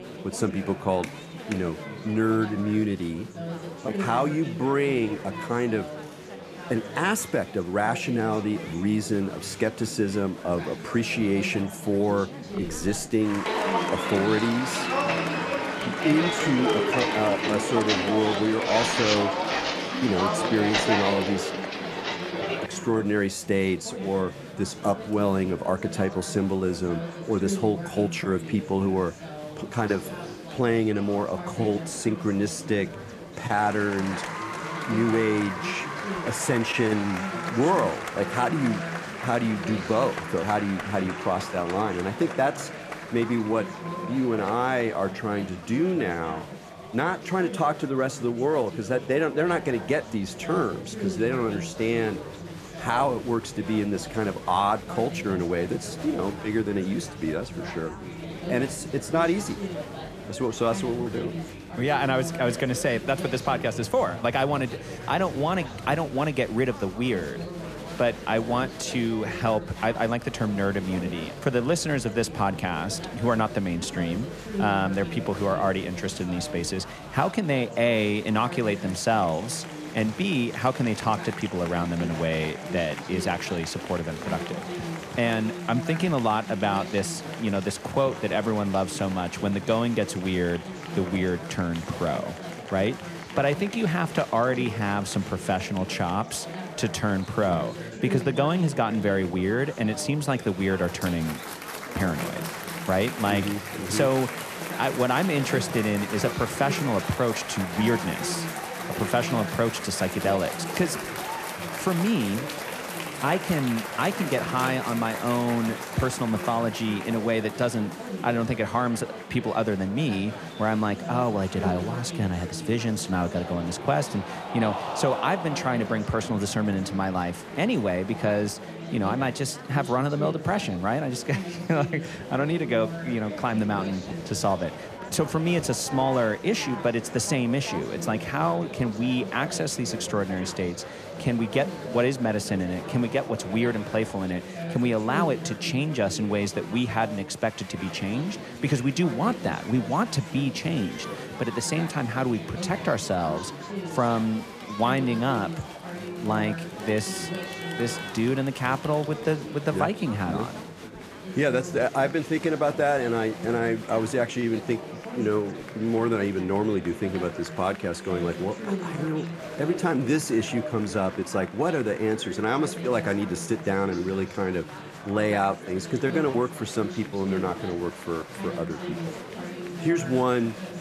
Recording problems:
chatter from many people; loud; throughout; 8 dB below the speech
footsteps; loud; from 13 to 23 s; peak 4 dB above the speech

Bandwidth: 14.5 kHz